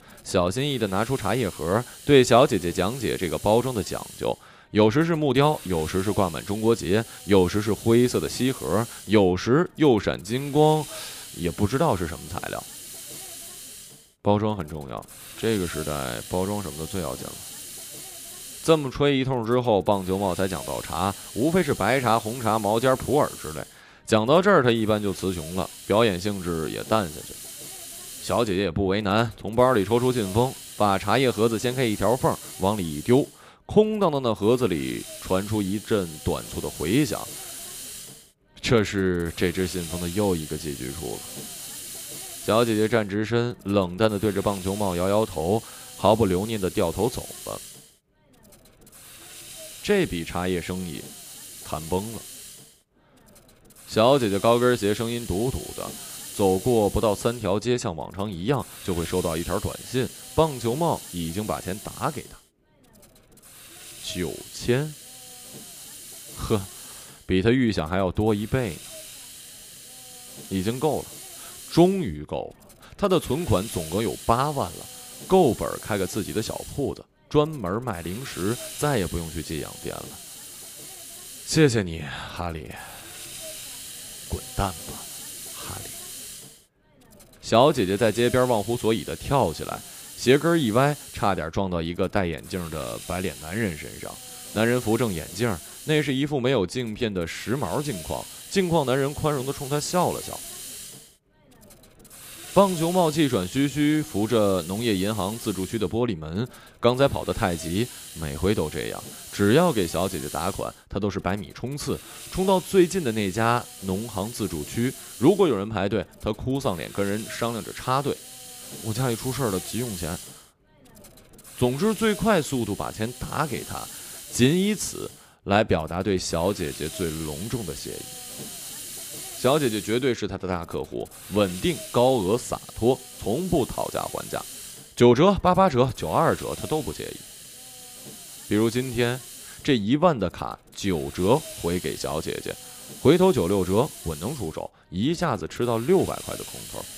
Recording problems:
hiss; noticeable; throughout; 15 dB below the speech

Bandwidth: 15 kHz